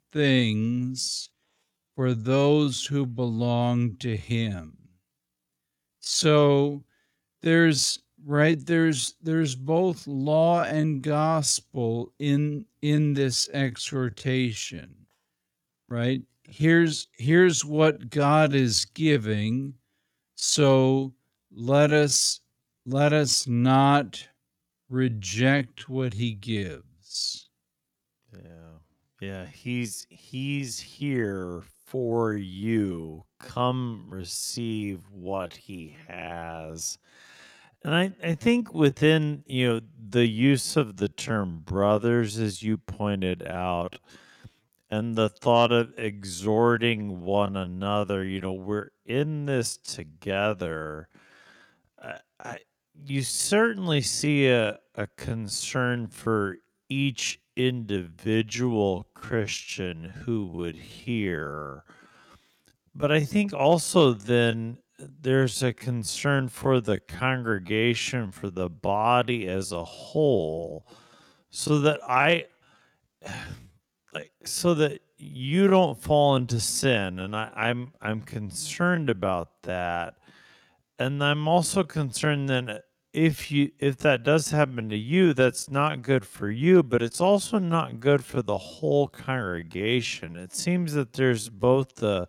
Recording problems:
wrong speed, natural pitch; too slow; 0.5 times normal speed

